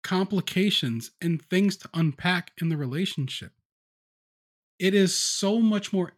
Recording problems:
none

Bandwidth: 17.5 kHz